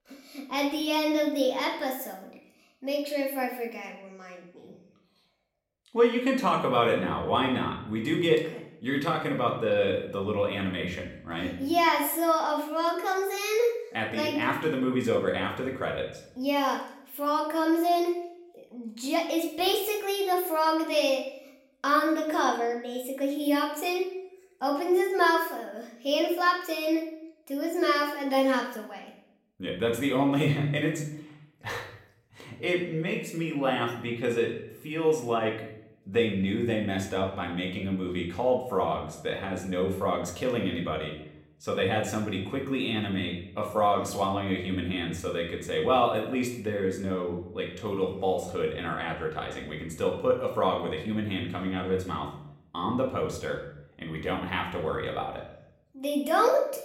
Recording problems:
room echo; slight; dies away in 0.6 s
off-mic speech; somewhat distant

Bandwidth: 16 kHz